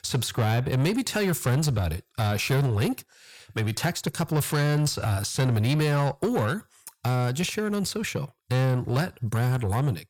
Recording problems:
distortion; slight; 10 dB below the speech

